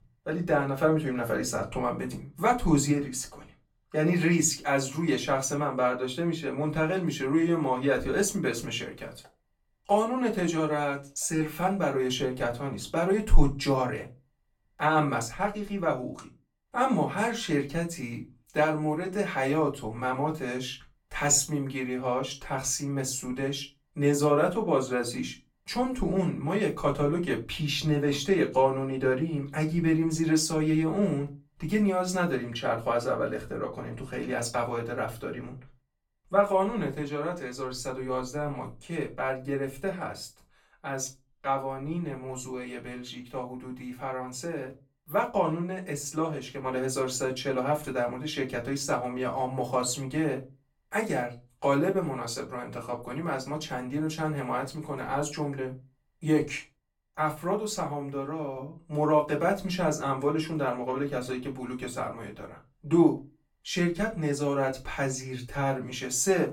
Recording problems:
off-mic speech; far
room echo; very slight; dies away in 0.2 s

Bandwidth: 17.5 kHz